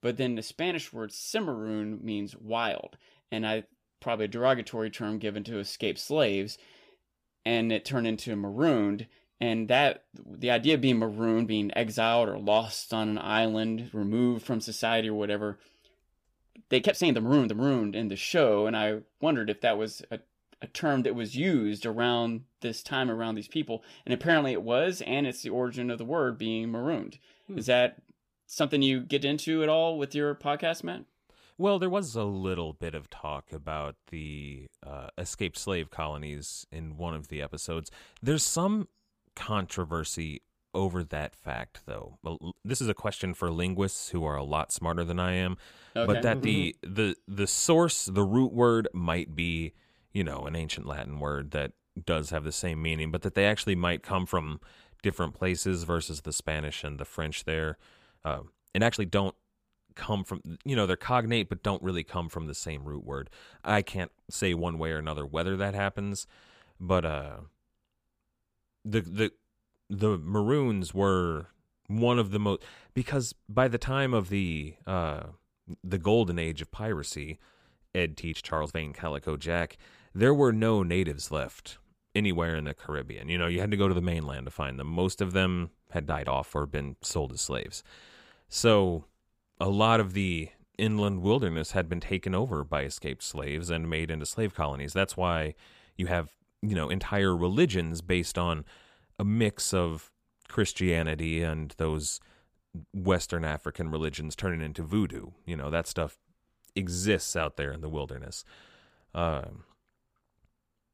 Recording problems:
uneven, jittery; strongly; from 13 s to 1:36

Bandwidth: 15 kHz